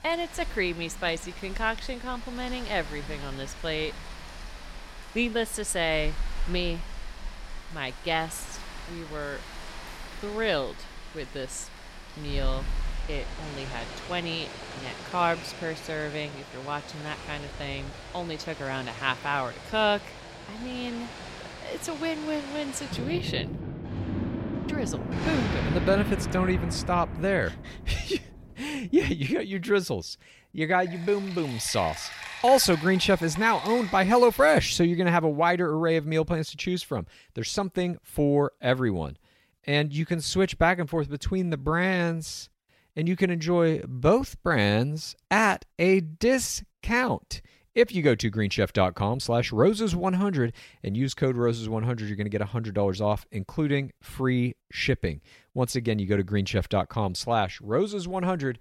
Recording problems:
rain or running water; noticeable; until 34 s; 10 dB below the speech

